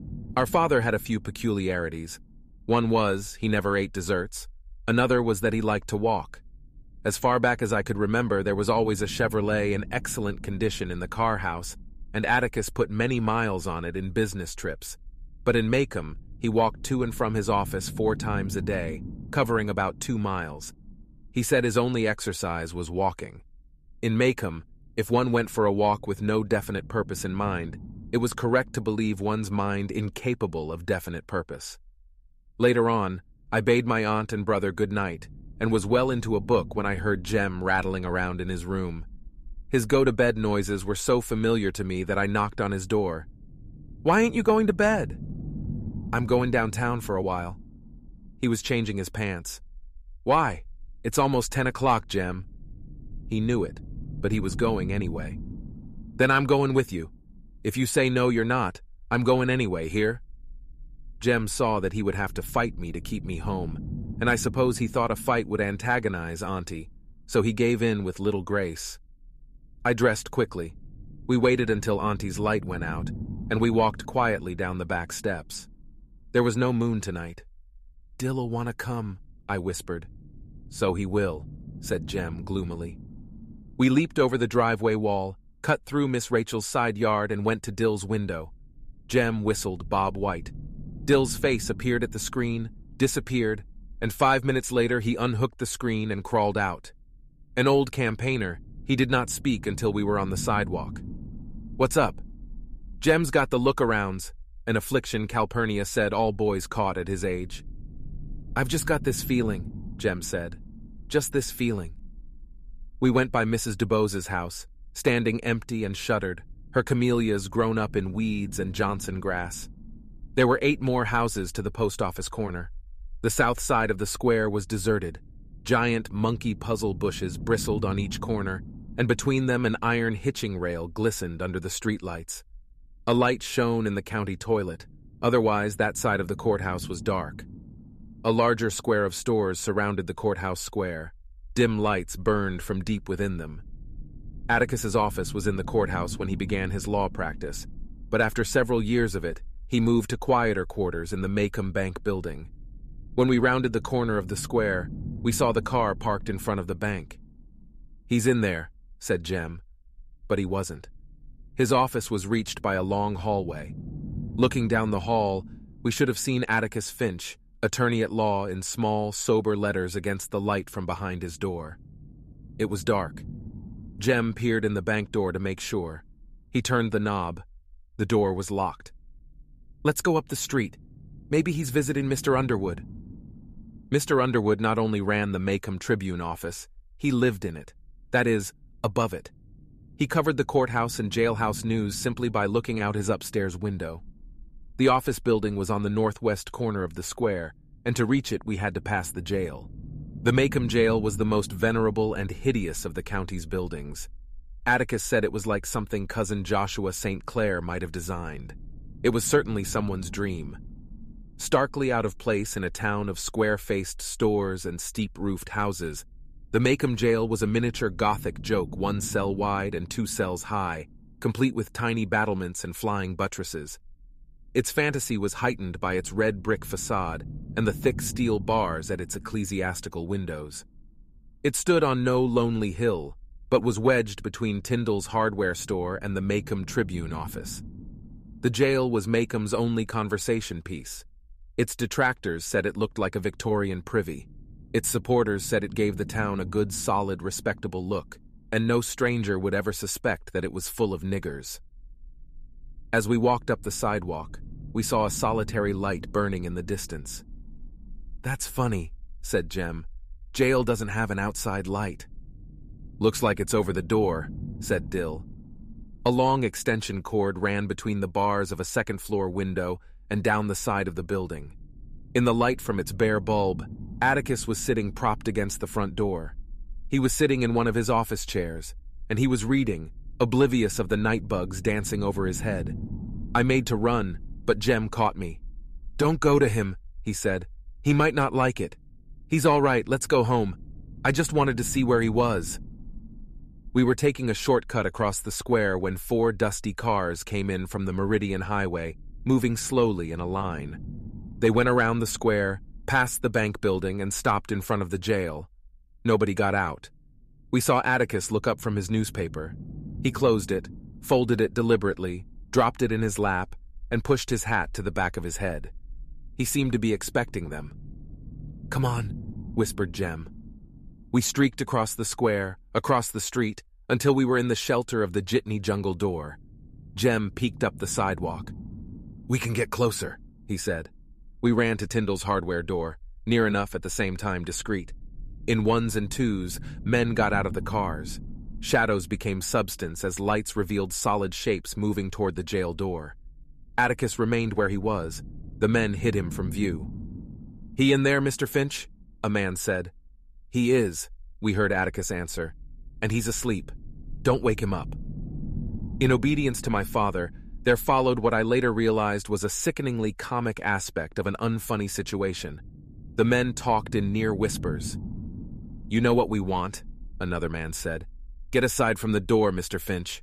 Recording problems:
low rumble; faint; throughout; 25 dB below the speech

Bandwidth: 14.5 kHz